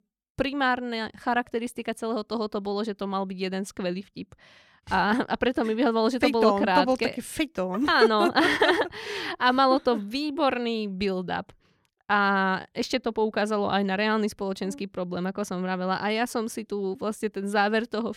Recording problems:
none

